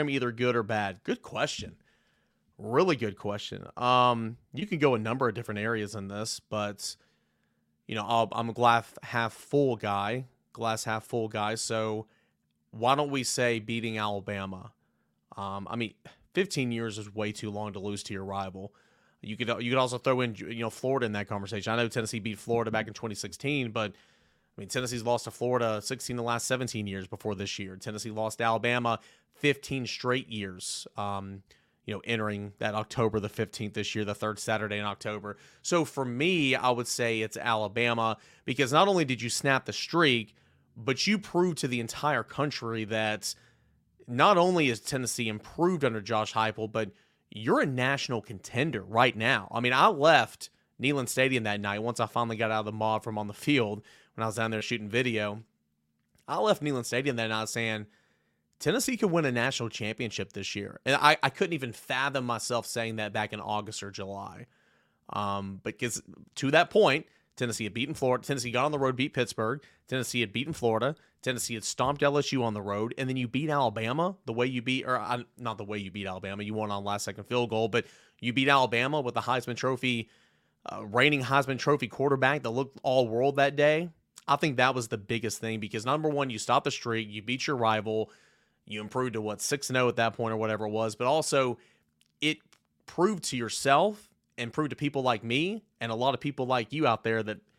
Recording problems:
abrupt cut into speech; at the start

